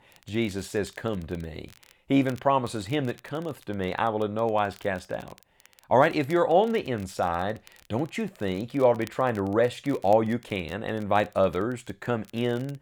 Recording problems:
crackle, like an old record; faint; 25 dB below the speech

